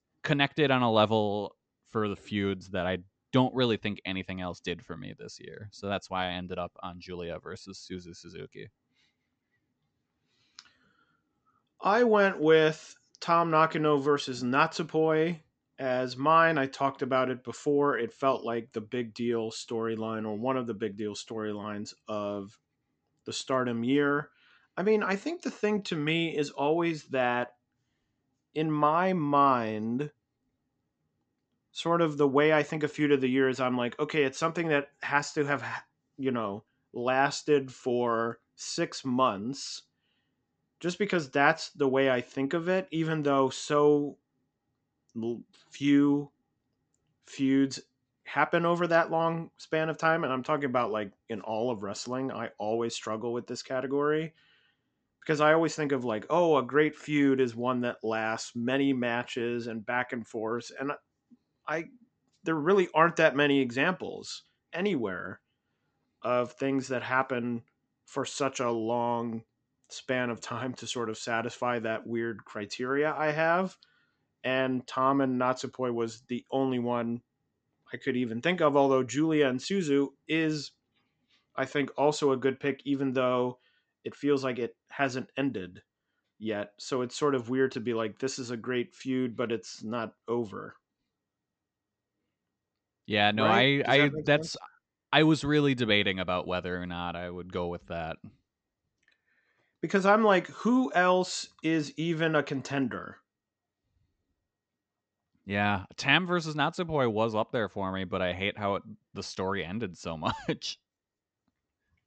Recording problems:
high frequencies cut off; noticeable; nothing above 8 kHz

